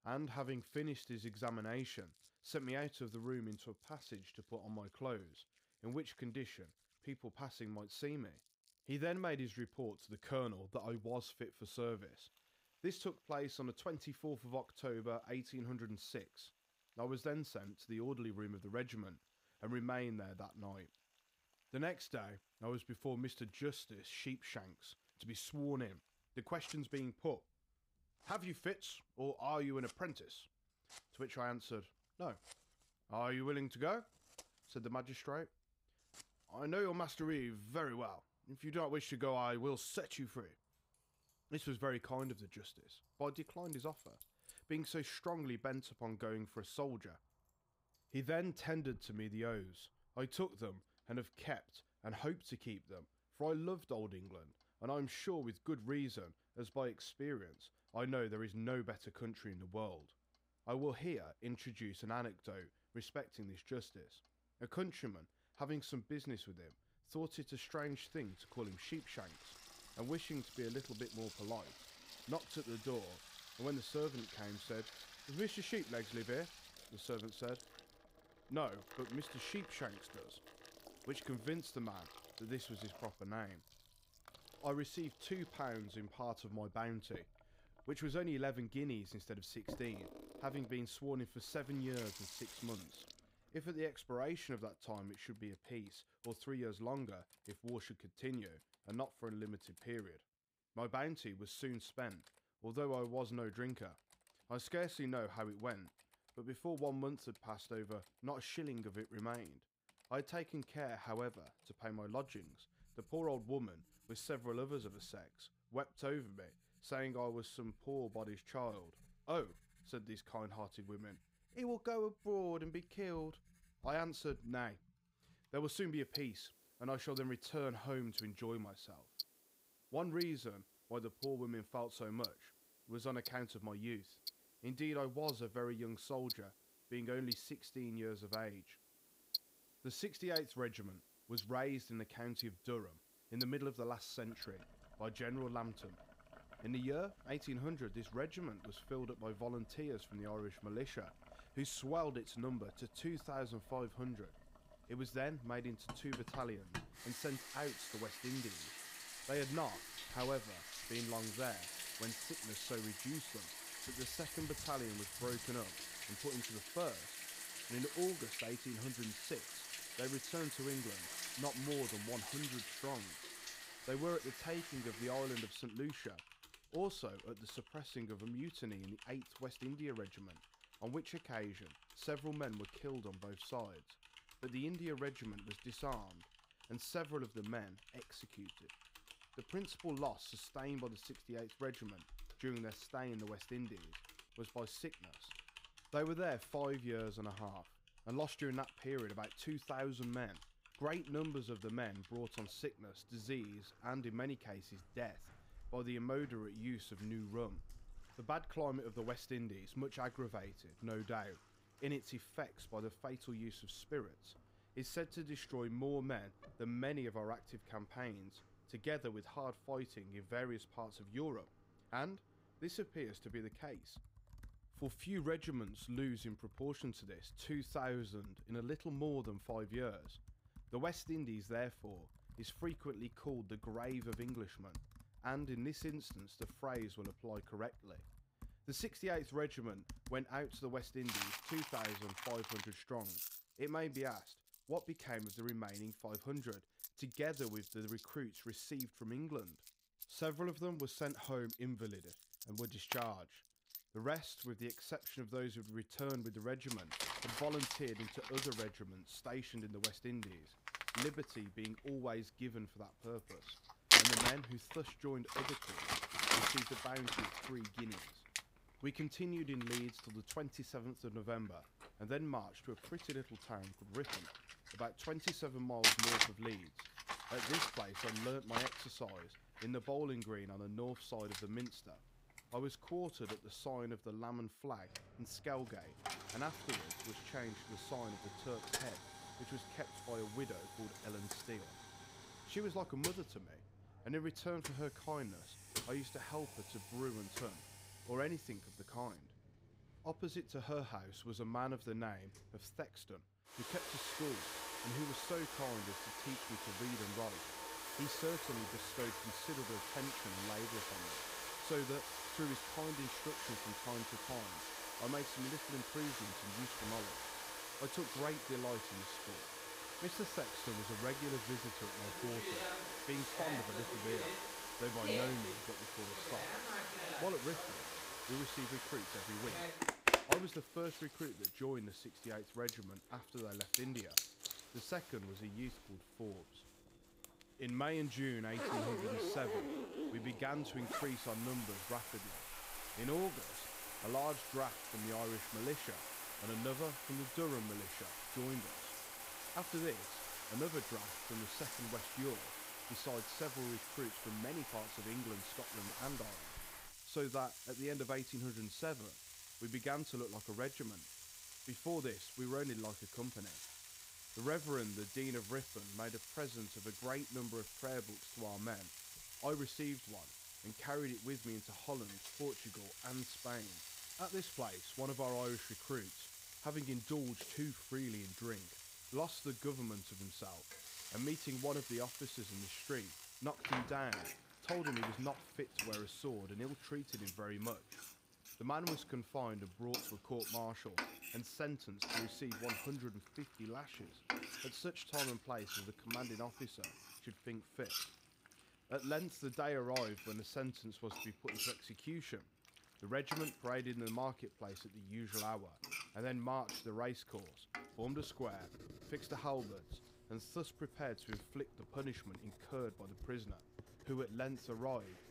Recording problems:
household noises; very loud; throughout; 1 dB above the speech

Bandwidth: 15.5 kHz